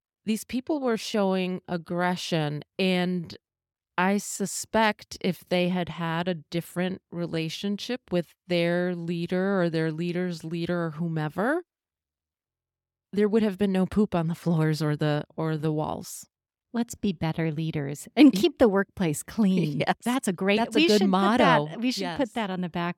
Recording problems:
uneven, jittery; strongly; from 0.5 to 21 s

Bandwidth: 17 kHz